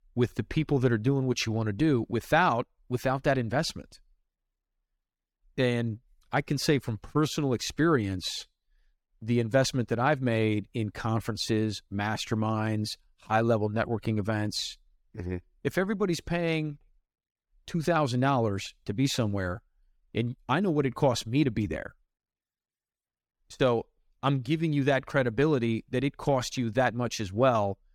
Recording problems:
none

